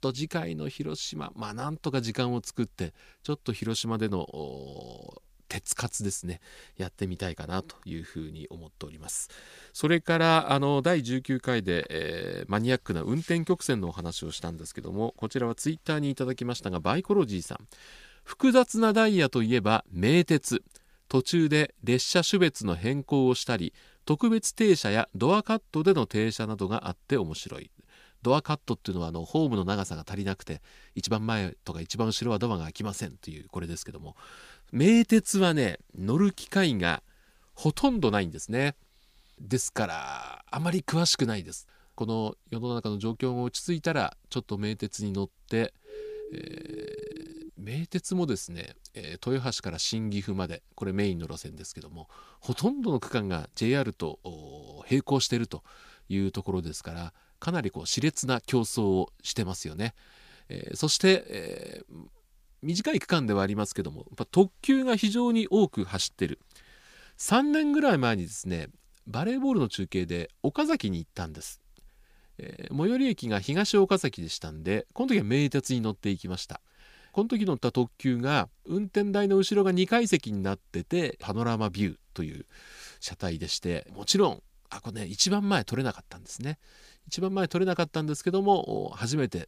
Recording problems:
uneven, jittery; slightly; from 9.5 s to 1:03
siren; faint; from 46 to 47 s; peak 10 dB below the speech

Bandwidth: 15 kHz